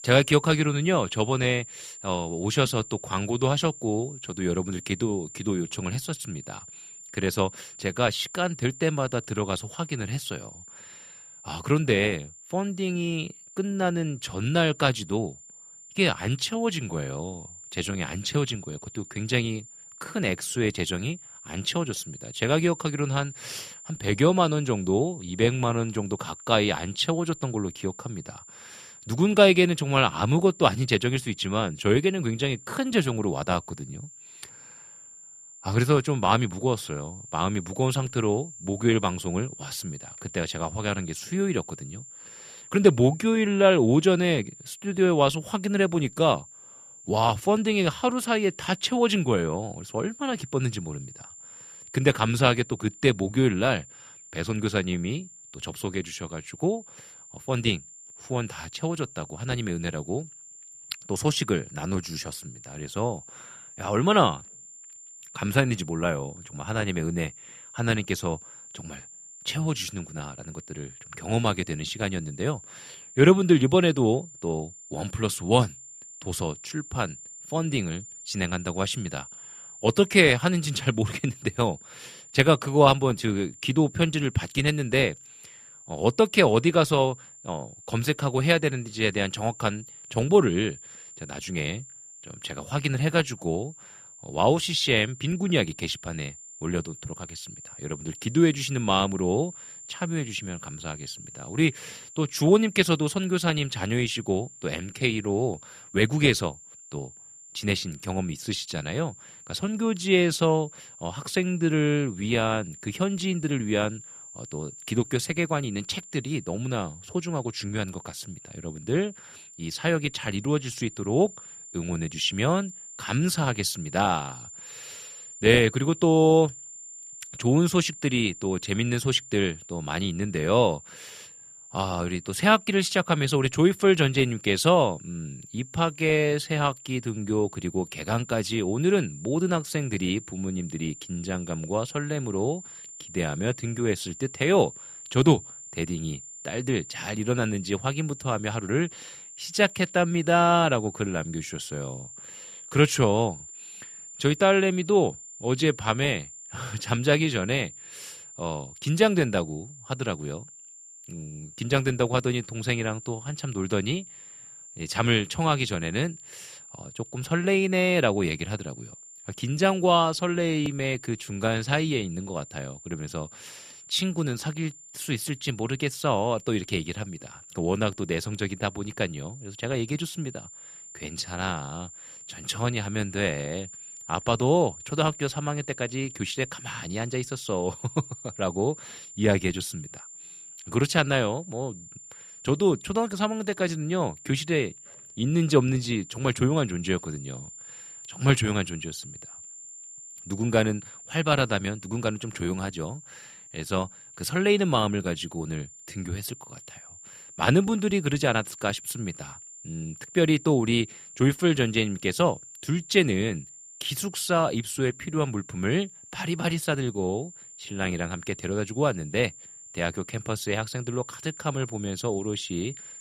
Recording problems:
high-pitched whine; noticeable; throughout; 7 kHz, 15 dB below the speech

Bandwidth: 14.5 kHz